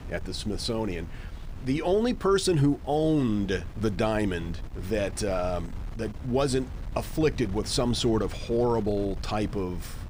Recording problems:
wind noise on the microphone; occasional gusts; 20 dB below the speech

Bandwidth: 15.5 kHz